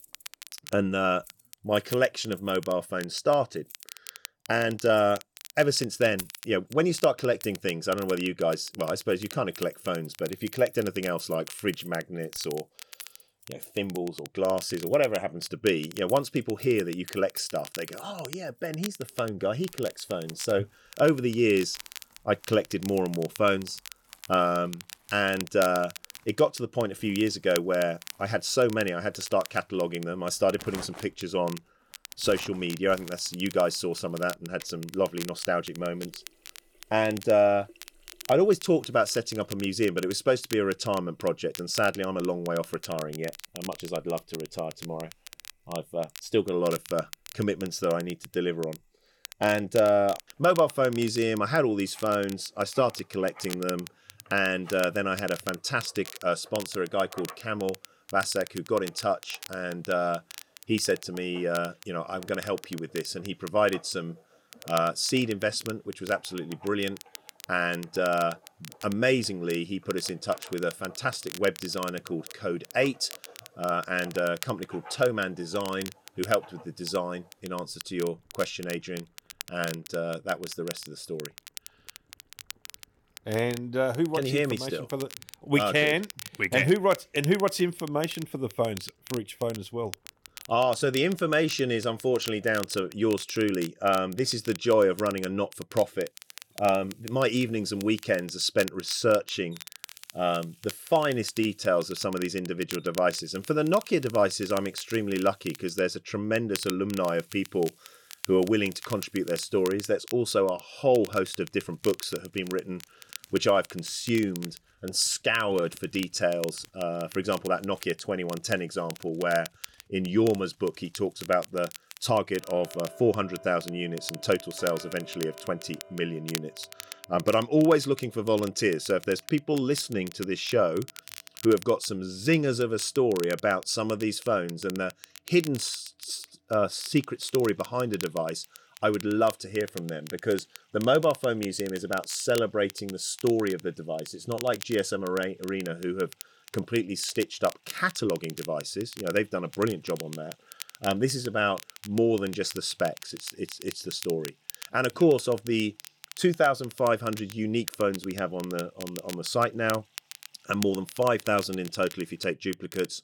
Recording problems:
crackle, like an old record; noticeable; 15 dB below the speech
household noises; faint; throughout; 25 dB below the speech

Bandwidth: 18.5 kHz